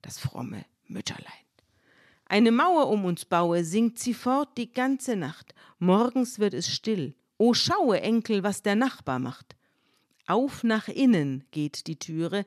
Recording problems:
none

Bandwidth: 13.5 kHz